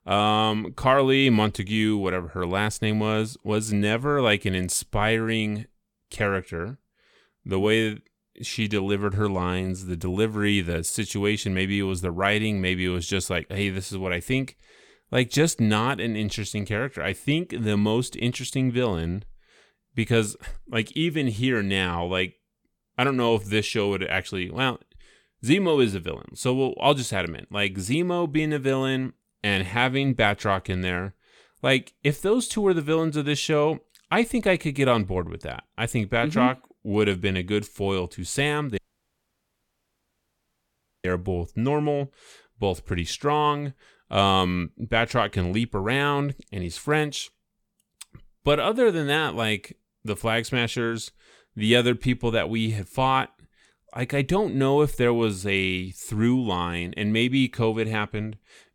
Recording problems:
audio cutting out; at 39 s for 2.5 s

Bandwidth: 18.5 kHz